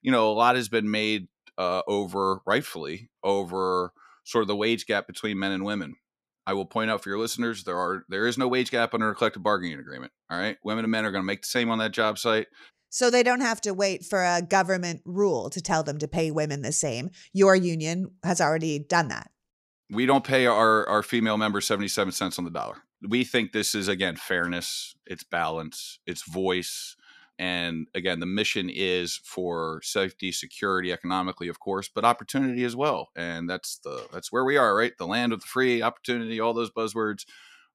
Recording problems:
none

